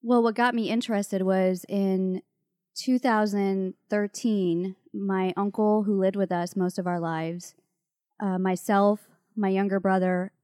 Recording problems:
none

